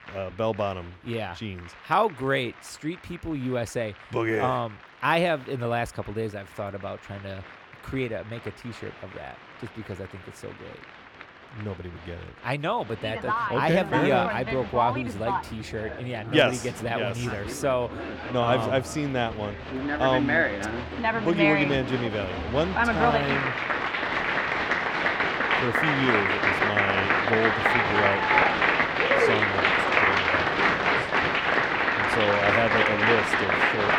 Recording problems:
crowd noise; very loud; throughout; 4 dB above the speech

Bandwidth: 17.5 kHz